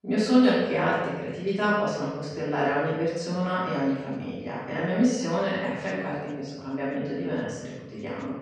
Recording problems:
room echo; strong; dies away in 1.1 s
off-mic speech; far
voice in the background; faint; throughout; 25 dB below the speech

